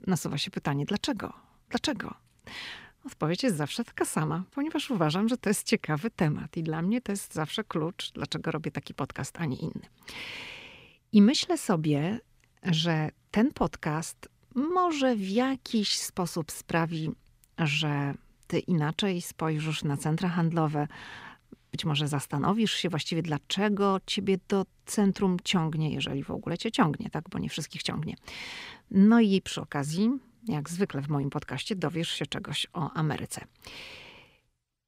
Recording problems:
none

